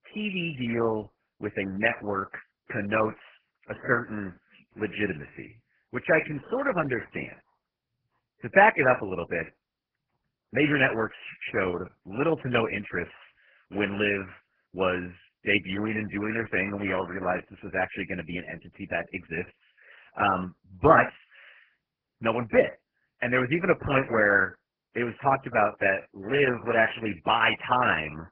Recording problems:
garbled, watery; badly; nothing above 3 kHz

